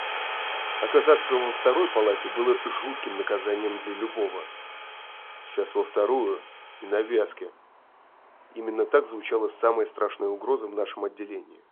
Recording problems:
phone-call audio
traffic noise; loud; throughout; 7 dB below the speech

